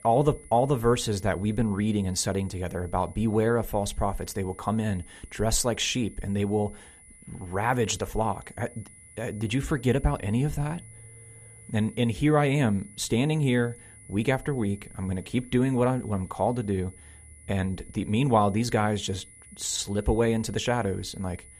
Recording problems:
high-pitched whine; faint; throughout; 10 kHz, 20 dB below the speech

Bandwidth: 14.5 kHz